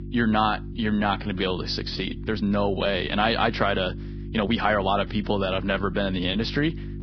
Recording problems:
garbled, watery; badly; nothing above 5.5 kHz
electrical hum; noticeable; throughout; 50 Hz, 20 dB below the speech
uneven, jittery; strongly; from 0.5 to 6.5 s

